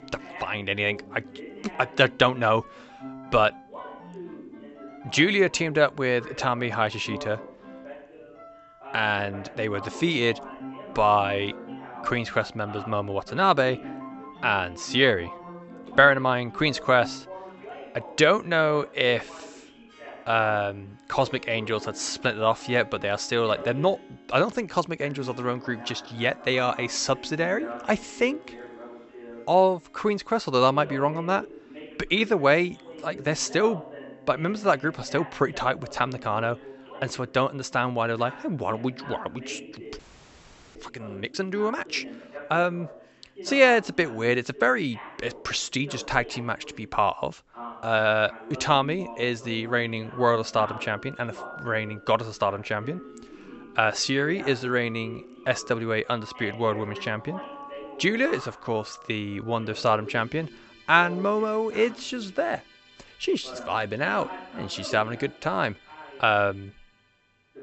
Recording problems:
high frequencies cut off; noticeable; nothing above 8 kHz
voice in the background; noticeable; throughout; 20 dB below the speech
background music; faint; throughout; 20 dB below the speech
audio freezing; at 40 s for 1 s

